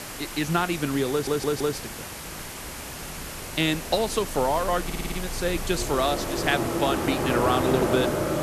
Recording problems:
train or aircraft noise; loud; throughout; 2 dB below the speech
hiss; loud; throughout; 9 dB below the speech
animal sounds; faint; throughout; 25 dB below the speech
crackling; faint; from 5 to 6.5 s; 20 dB below the speech
audio stuttering; at 1 s and at 5 s

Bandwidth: 13.5 kHz